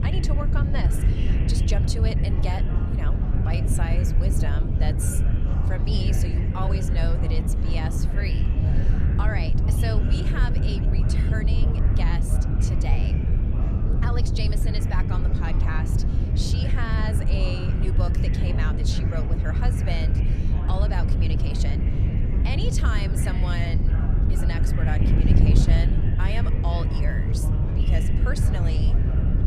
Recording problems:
wind noise on the microphone; heavy; 2 dB below the speech
chatter from many people; loud; throughout; 8 dB below the speech

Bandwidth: 14 kHz